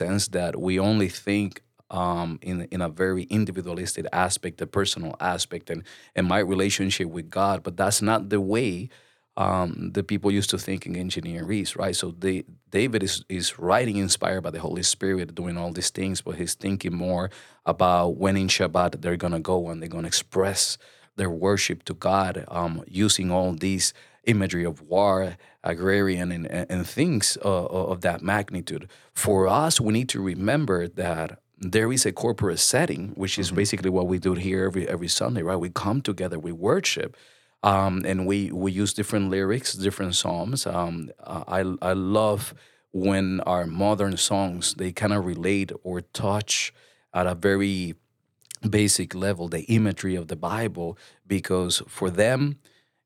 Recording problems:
abrupt cut into speech; at the start

